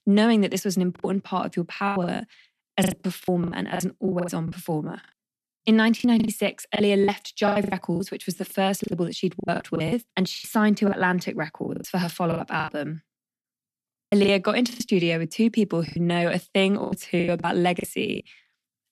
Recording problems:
choppy; very; 16% of the speech affected

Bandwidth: 13.5 kHz